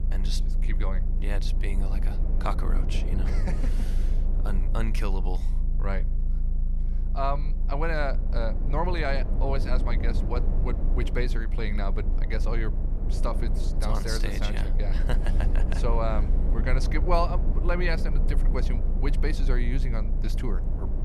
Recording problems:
low rumble; loud; throughout; 10 dB below the speech

